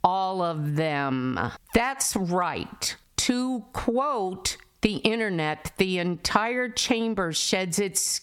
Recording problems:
squashed, flat; heavily

